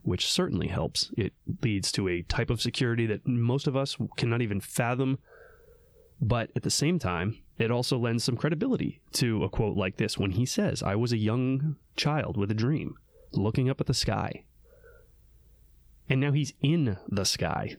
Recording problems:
squashed, flat; heavily

